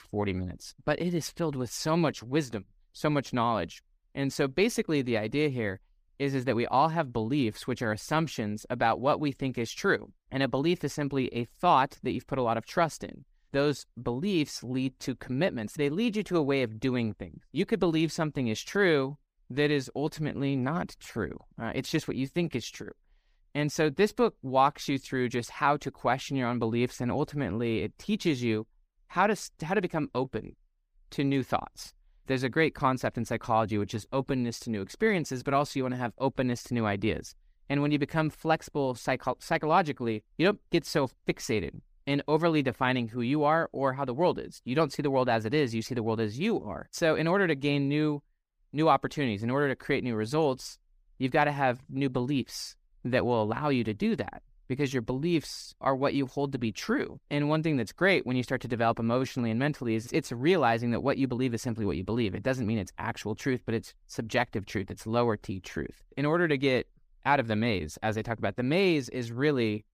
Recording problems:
none

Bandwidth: 15 kHz